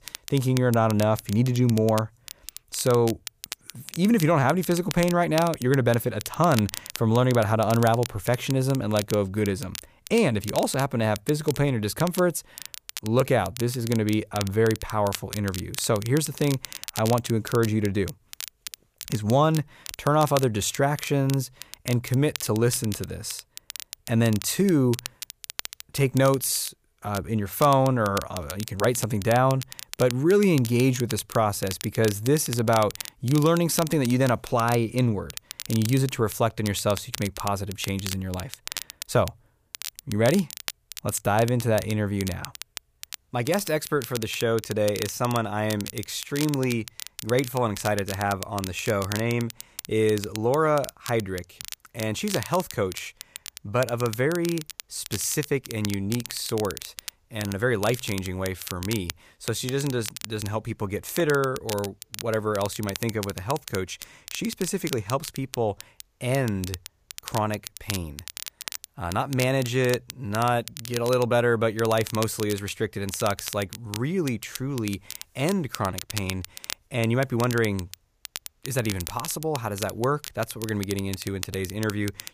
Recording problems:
crackle, like an old record; noticeable; 10 dB below the speech

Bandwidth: 15 kHz